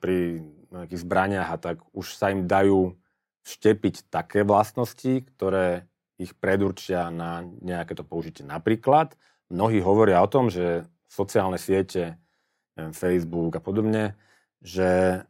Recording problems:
none

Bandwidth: 16 kHz